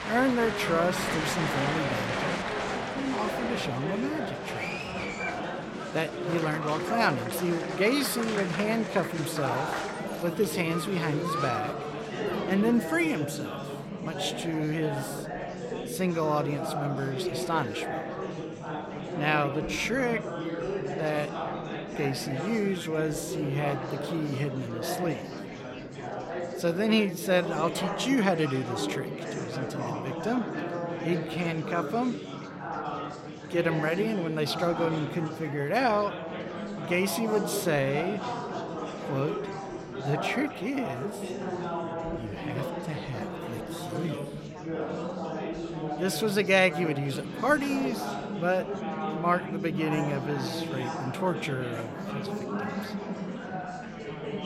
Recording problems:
murmuring crowd; loud; throughout; 4 dB below the speech

